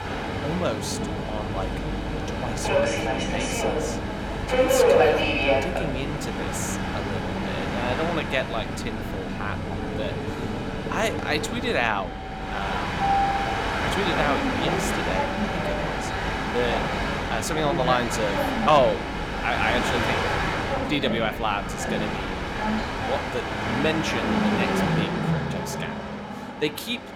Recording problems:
train or aircraft noise; very loud; throughout; 3 dB above the speech

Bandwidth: 17.5 kHz